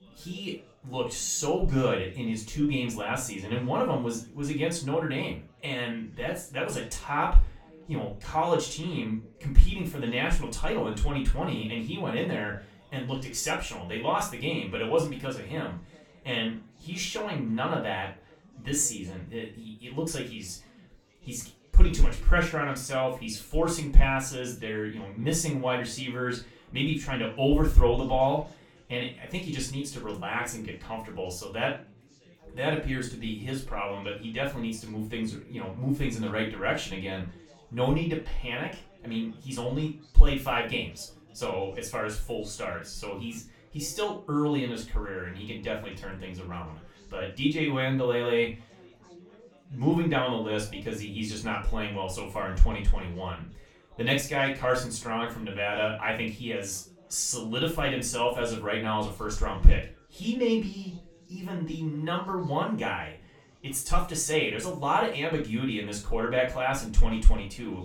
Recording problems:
off-mic speech; far
room echo; slight; dies away in 0.3 s
chatter from many people; faint; throughout; 25 dB below the speech

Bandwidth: 18 kHz